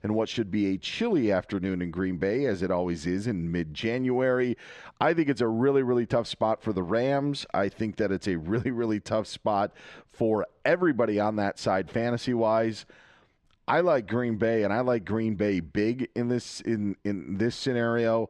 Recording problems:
muffled; slightly; fading above 3.5 kHz

